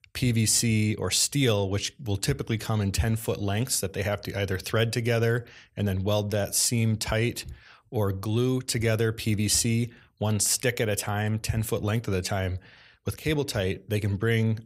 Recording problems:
none

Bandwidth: 15.5 kHz